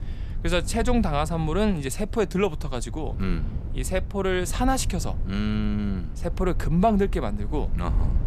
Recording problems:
low rumble; noticeable; throughout; 20 dB below the speech

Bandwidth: 15 kHz